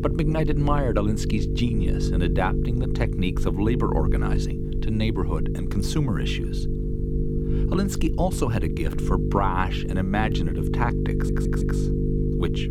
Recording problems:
electrical hum; loud; throughout; 50 Hz, 5 dB below the speech
low rumble; faint; throughout; 20 dB below the speech
audio stuttering; at 11 s

